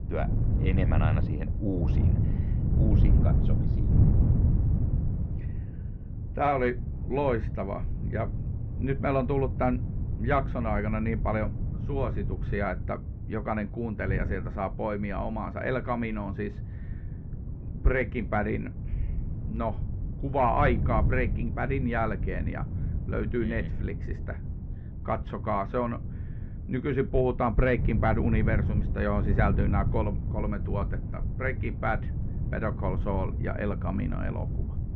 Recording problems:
muffled; very; fading above 2 kHz
wind noise on the microphone; occasional gusts; 10 dB below the speech

